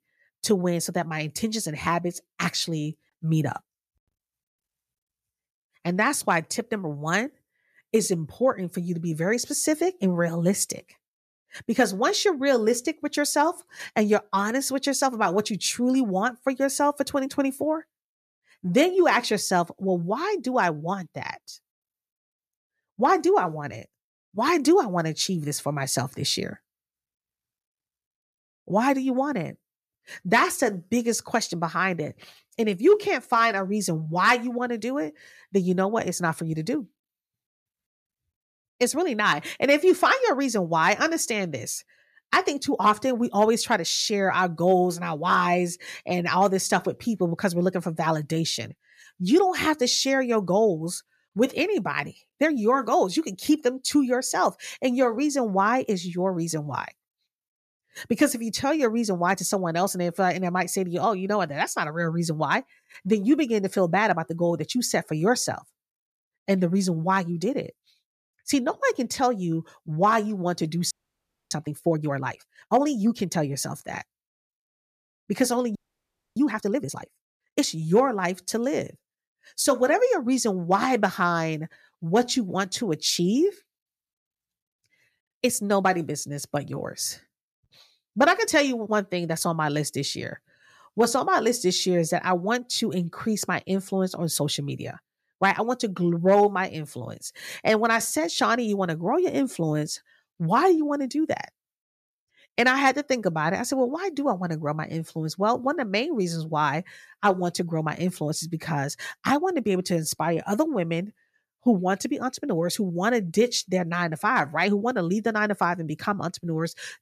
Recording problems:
audio freezing; at 1:11 for 0.5 s and at 1:16 for 0.5 s

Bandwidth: 14.5 kHz